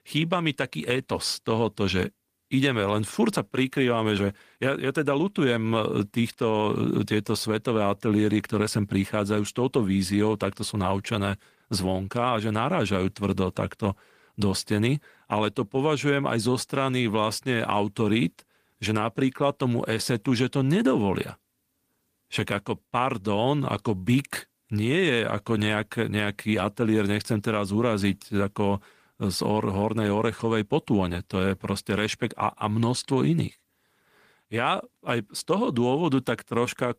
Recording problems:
garbled, watery; slightly; nothing above 15 kHz

